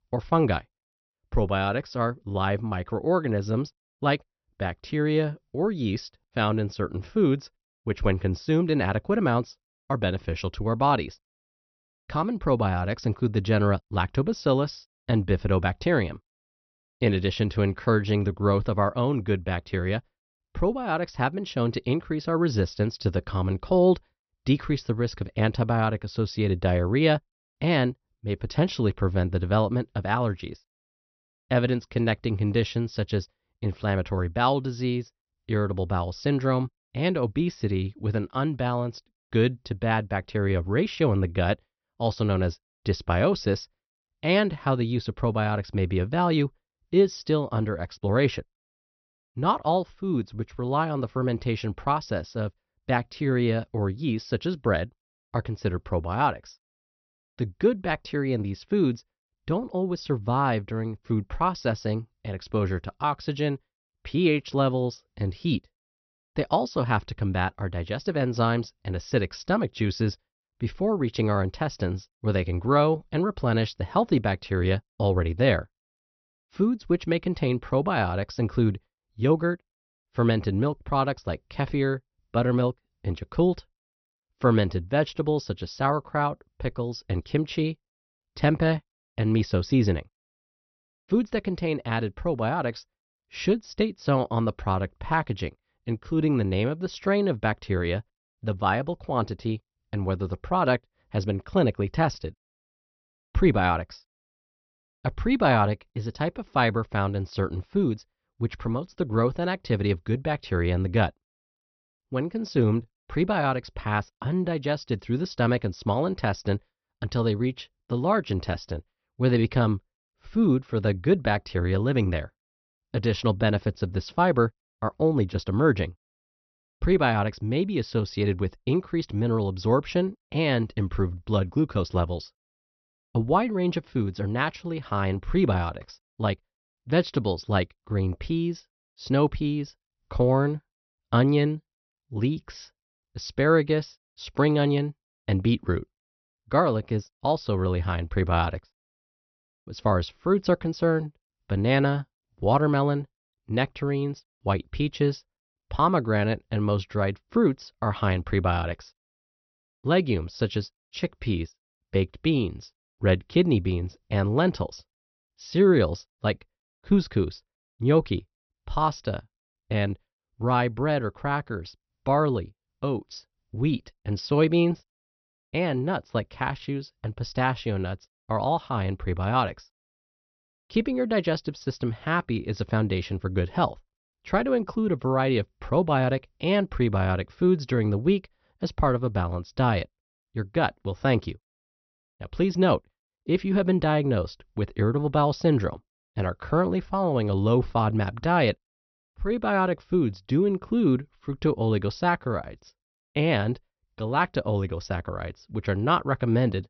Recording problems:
high frequencies cut off; noticeable; nothing above 6 kHz

